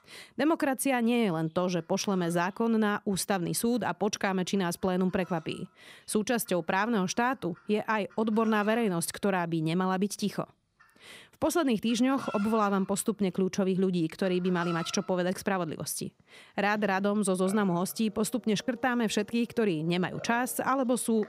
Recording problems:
animal sounds; faint; throughout; 20 dB below the speech

